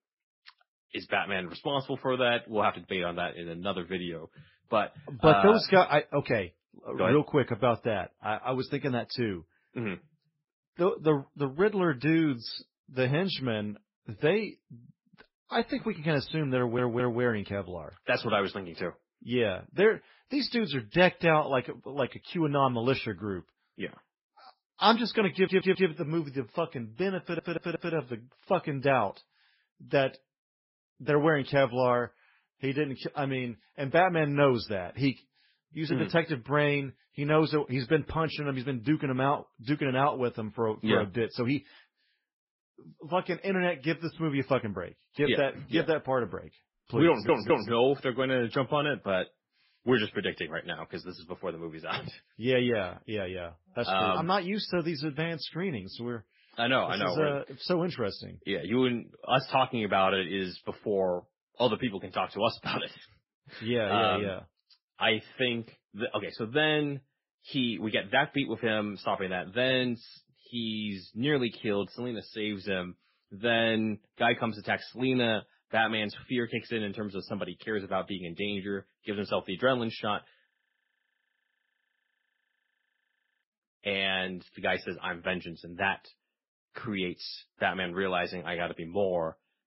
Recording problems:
garbled, watery; badly; nothing above 5.5 kHz
audio stuttering; 4 times, first at 17 s
audio freezing; at 1:20 for 3 s

